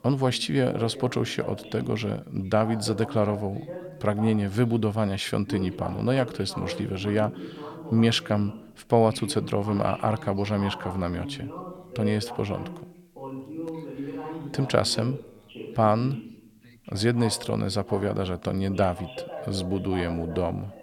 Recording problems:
background chatter; noticeable; throughout; 2 voices, 10 dB below the speech

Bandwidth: 17.5 kHz